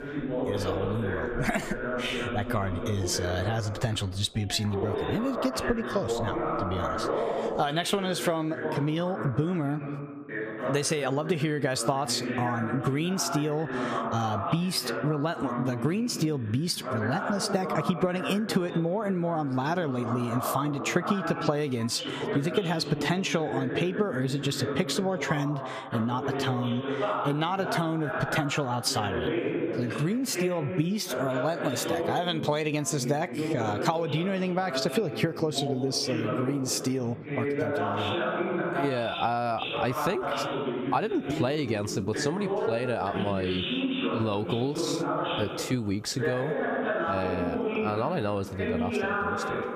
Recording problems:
squashed, flat; heavily
background chatter; loud; throughout; 2 voices, 3 dB below the speech

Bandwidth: 15 kHz